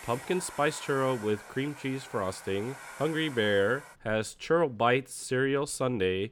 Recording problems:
household noises; noticeable; throughout; 15 dB below the speech

